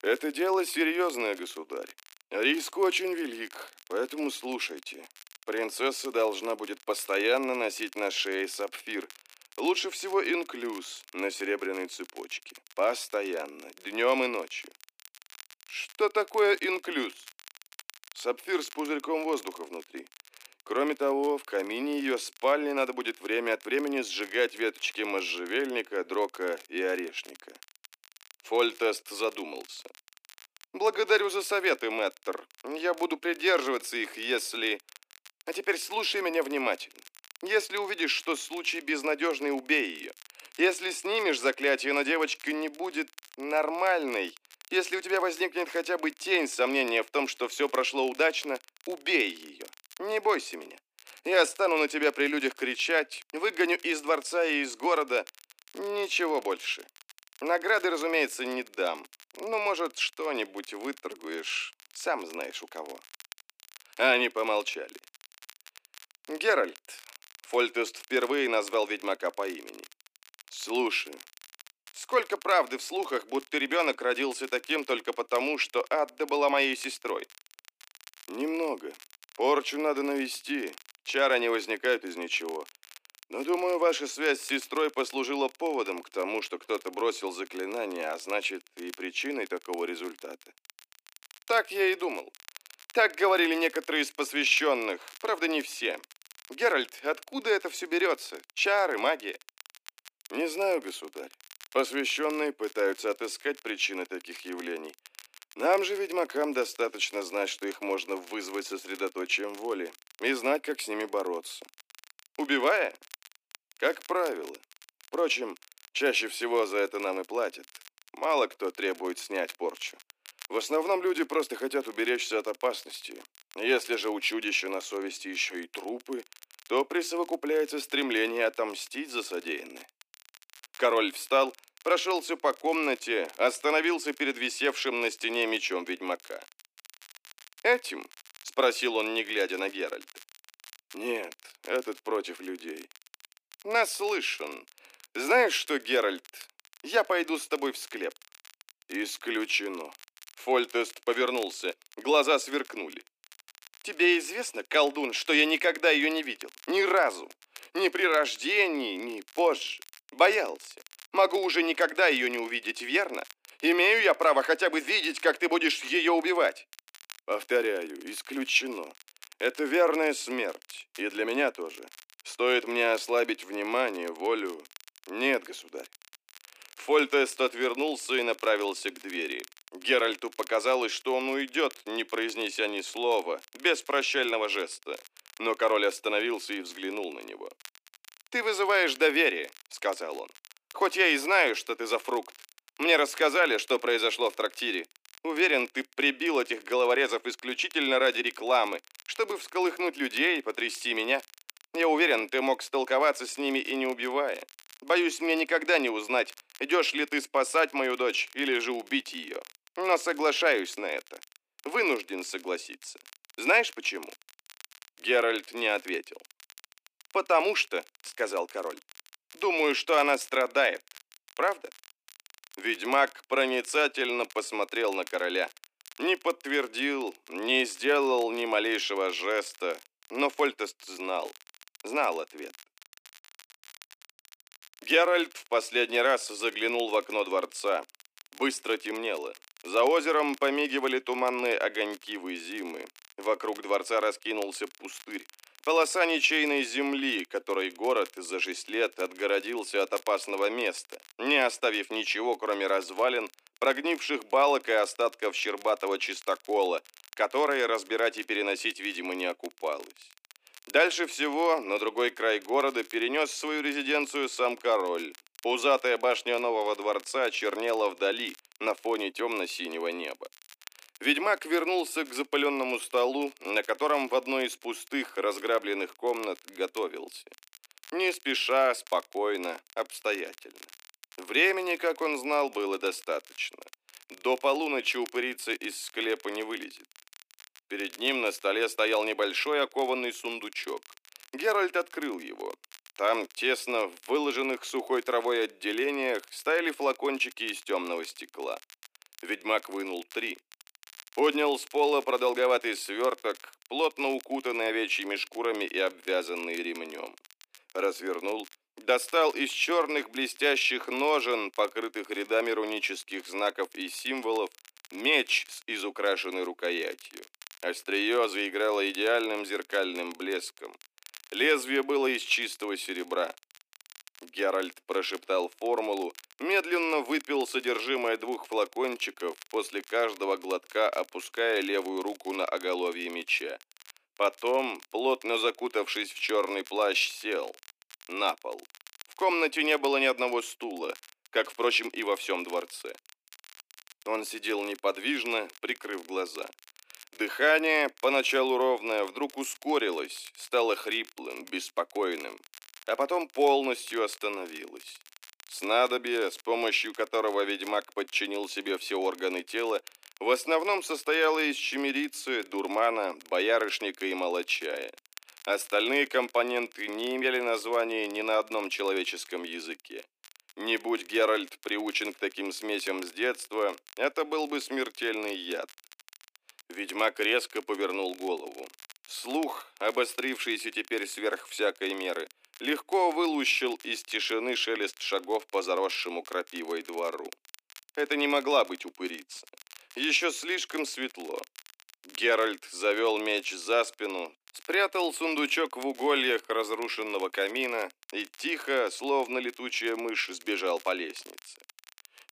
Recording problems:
thin; somewhat; fading below 250 Hz
crackle, like an old record; faint; 25 dB below the speech

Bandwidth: 15 kHz